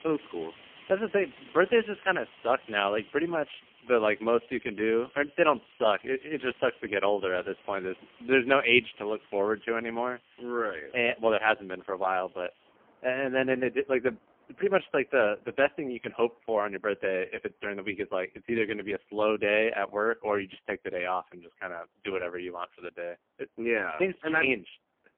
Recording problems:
phone-call audio; poor line; nothing above 3 kHz
traffic noise; faint; throughout; 25 dB below the speech

